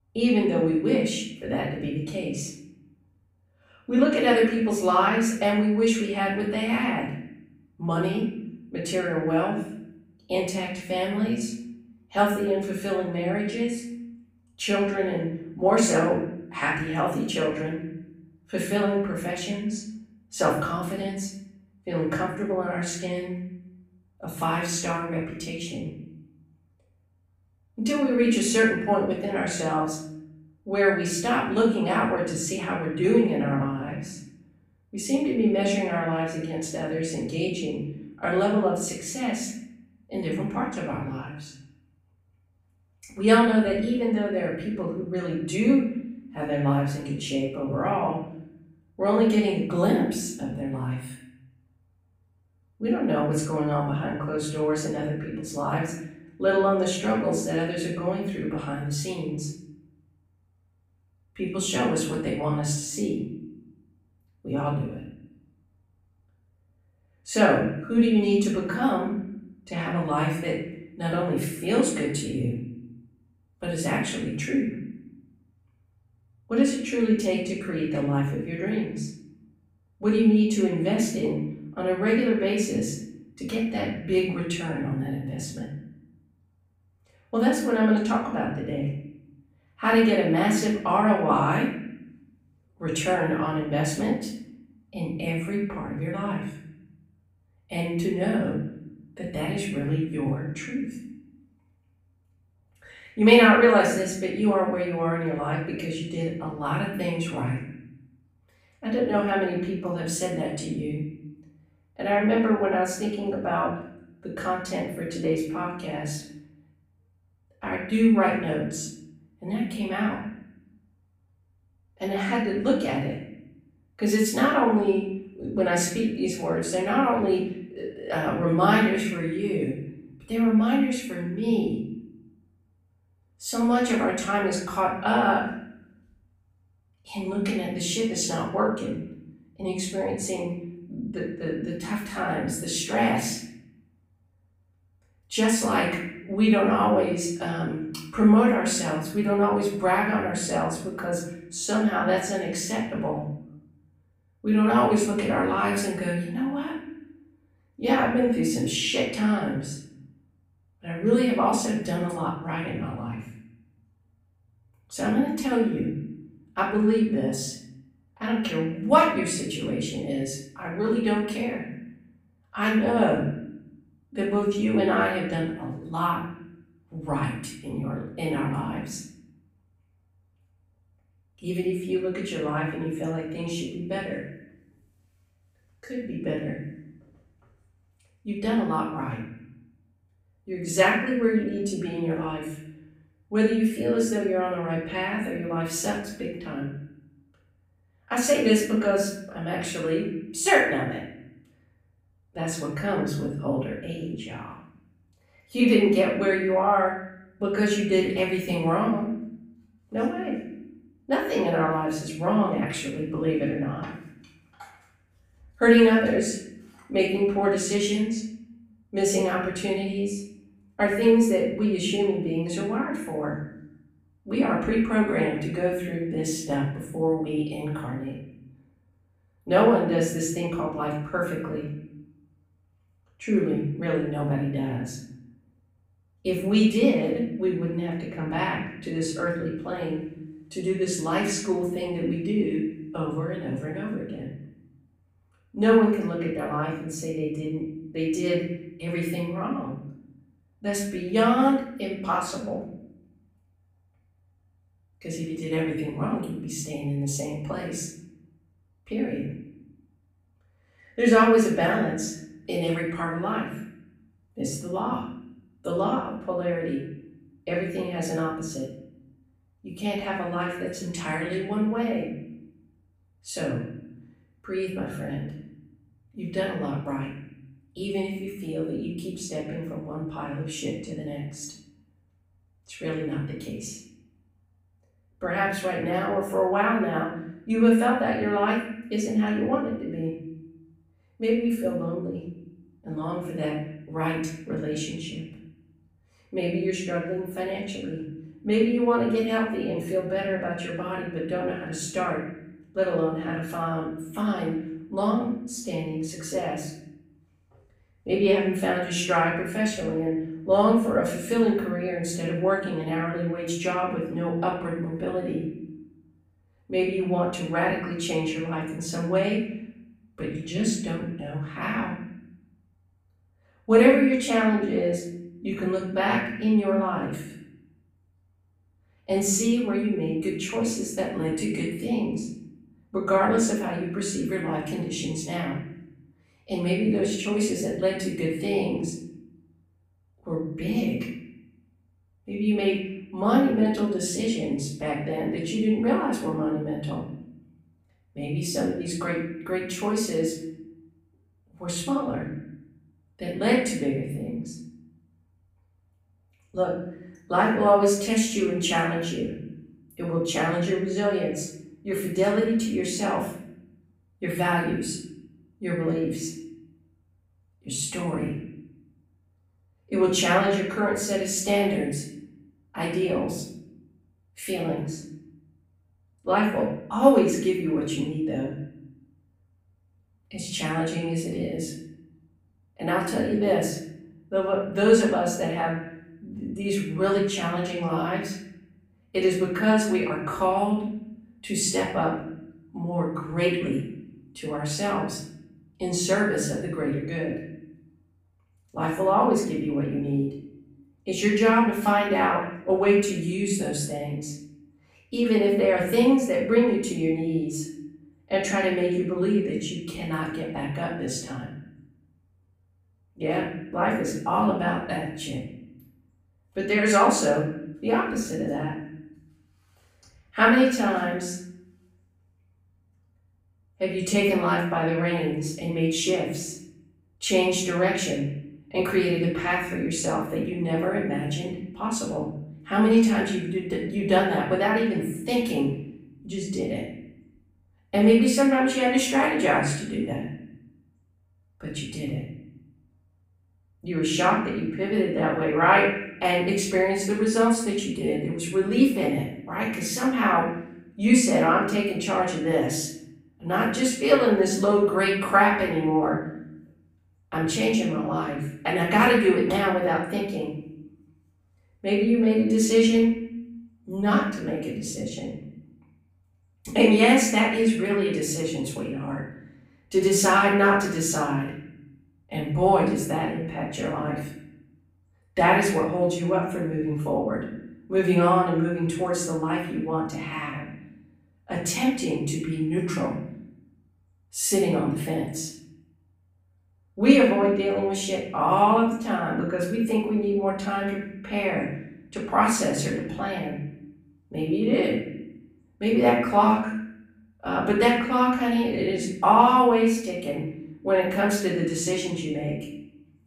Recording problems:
off-mic speech; far
room echo; noticeable; dies away in 0.8 s

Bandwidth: 15.5 kHz